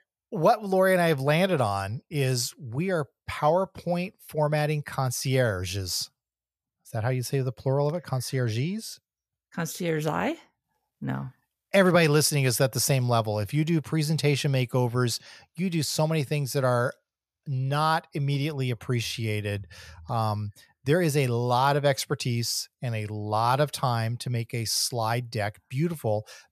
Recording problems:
none

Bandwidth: 14.5 kHz